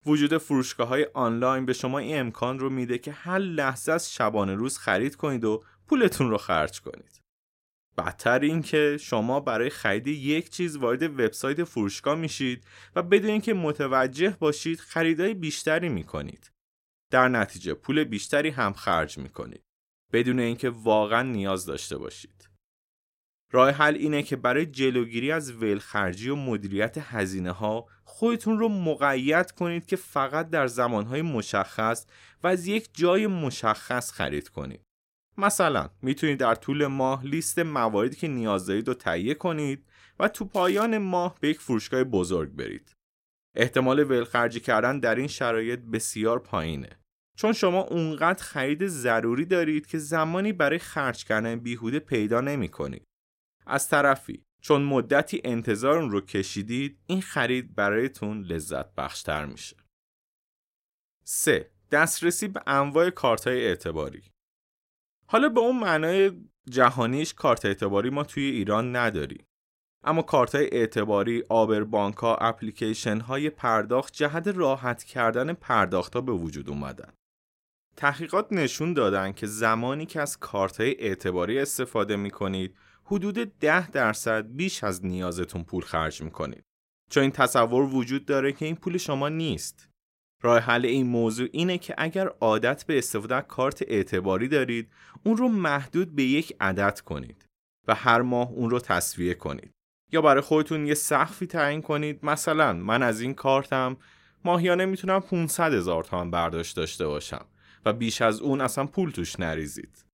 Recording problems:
crackling; faint; at 41 s; 20 dB below the speech

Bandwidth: 16 kHz